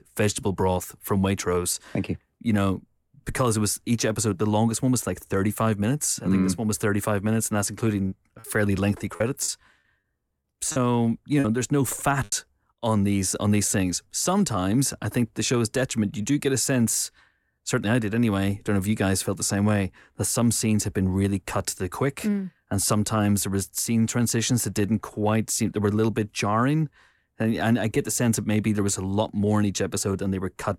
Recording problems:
choppy; very; from 8 to 11 s; 9% of the speech affected

